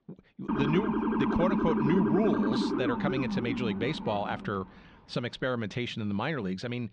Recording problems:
muffled; slightly; fading above 3.5 kHz
siren; loud; until 4.5 s; peak 4 dB above the speech

